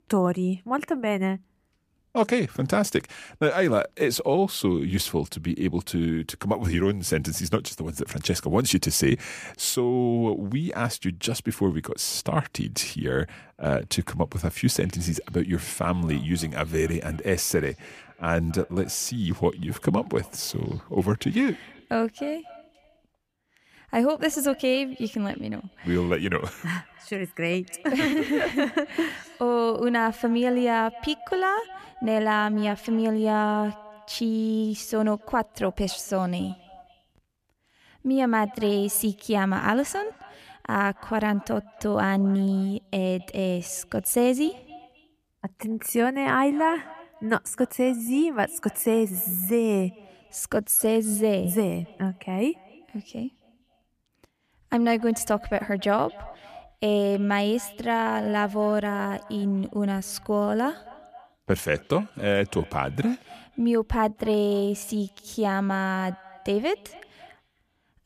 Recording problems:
echo of what is said; faint; from 15 s on; 270 ms later, 25 dB below the speech

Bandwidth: 14.5 kHz